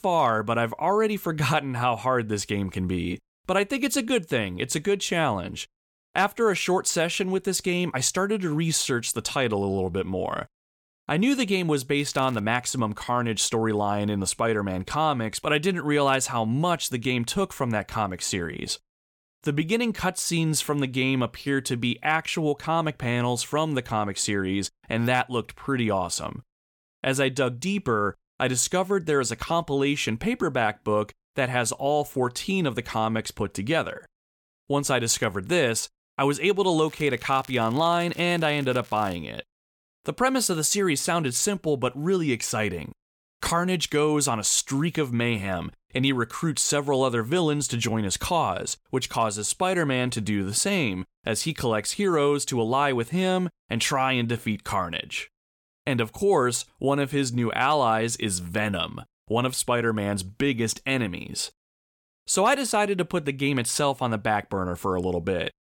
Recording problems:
crackling; faint; at 12 s and from 37 to 39 s; 25 dB below the speech

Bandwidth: 18 kHz